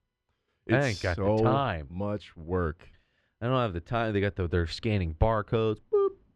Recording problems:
muffled; very slightly; fading above 3 kHz

